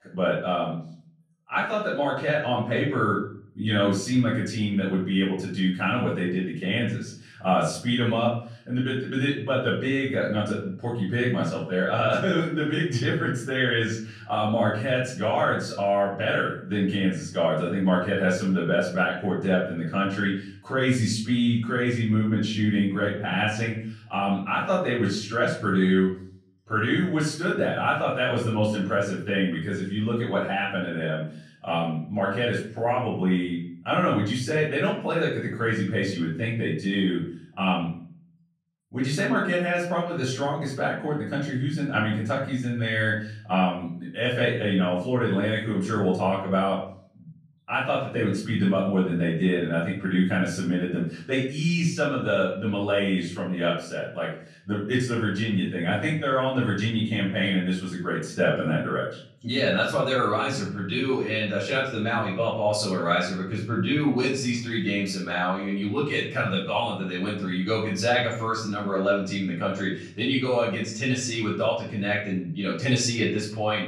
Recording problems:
off-mic speech; far
room echo; noticeable; dies away in 0.5 s

